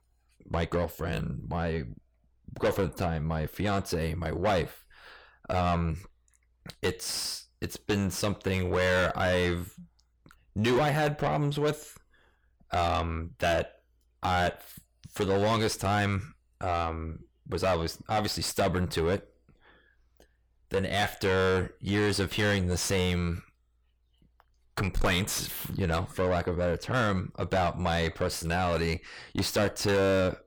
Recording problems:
distortion; heavy; 5 dB below the speech

